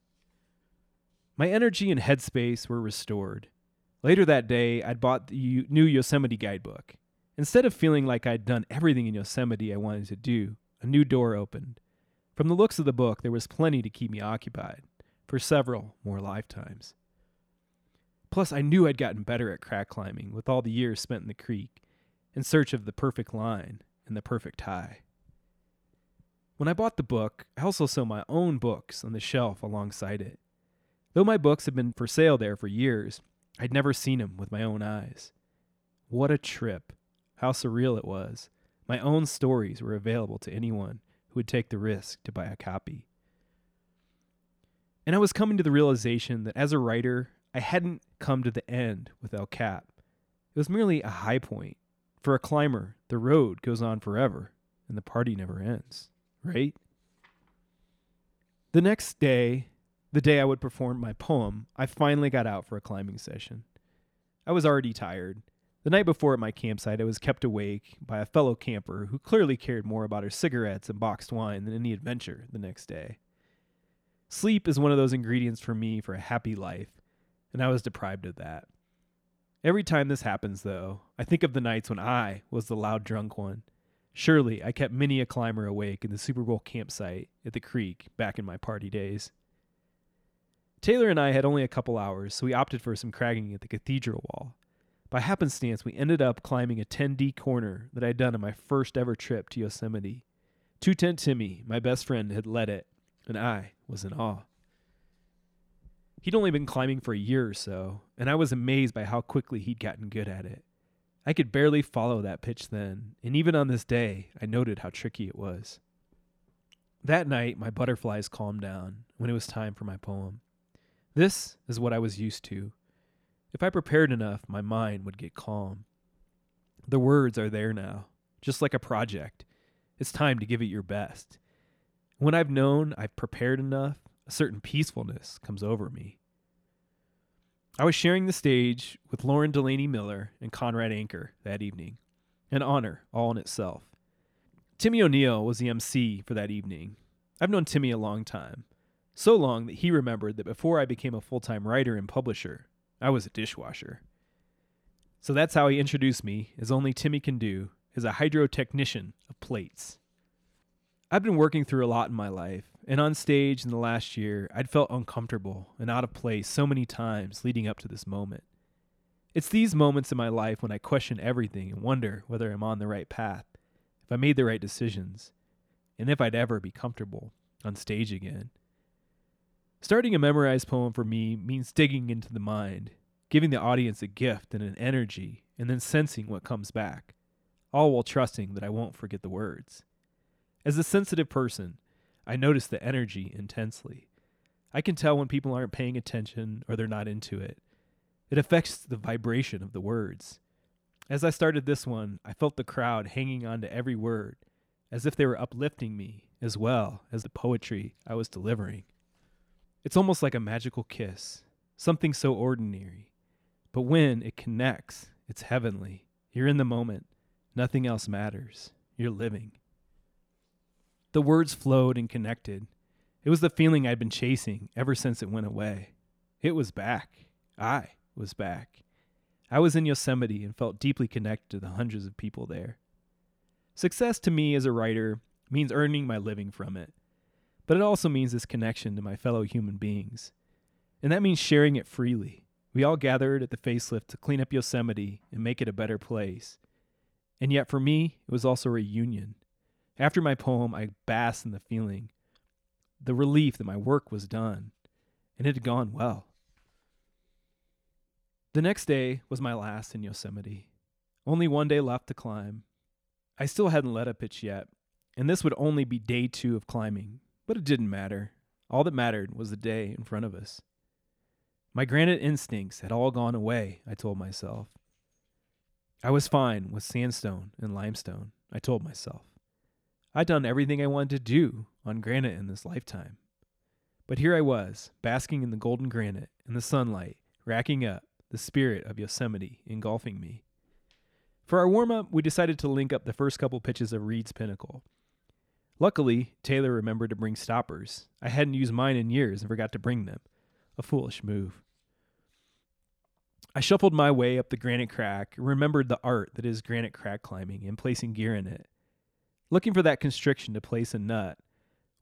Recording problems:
none

